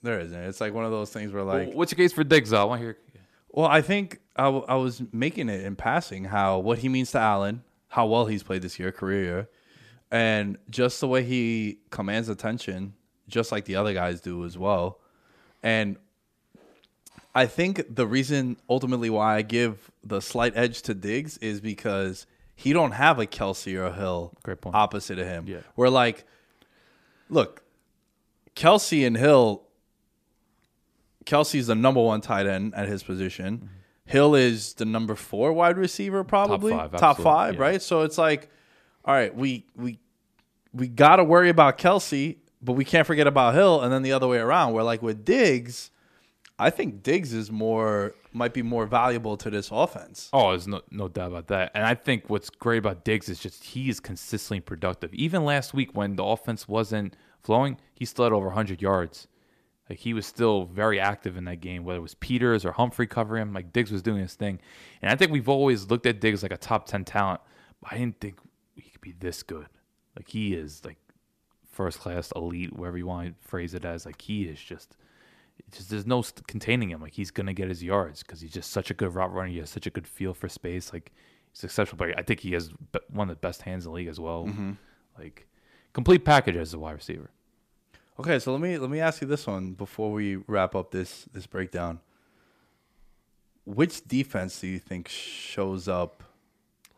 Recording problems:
none

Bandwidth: 14.5 kHz